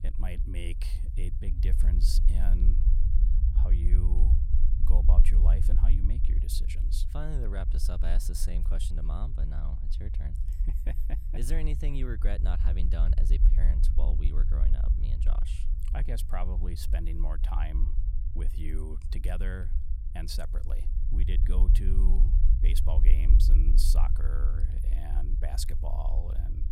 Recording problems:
low rumble; loud; throughout; 6 dB below the speech

